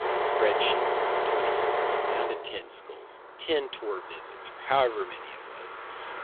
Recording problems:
phone-call audio; poor line; nothing above 3.5 kHz
traffic noise; very loud; throughout; 4 dB above the speech

